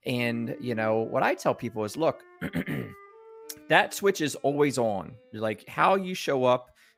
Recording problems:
background music; faint; throughout; 25 dB below the speech

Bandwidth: 15.5 kHz